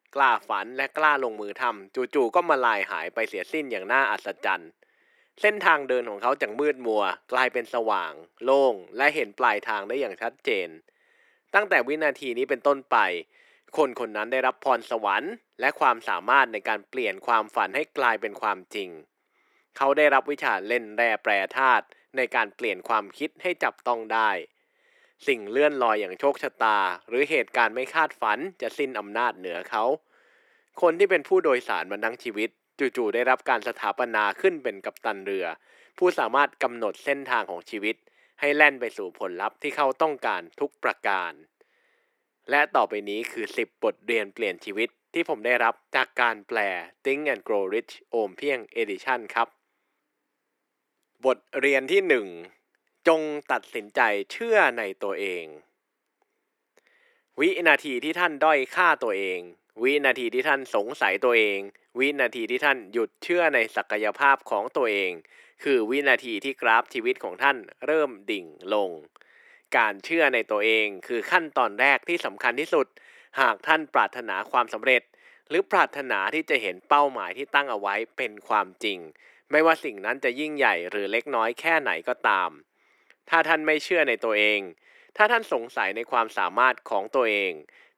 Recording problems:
thin; somewhat; fading below 350 Hz

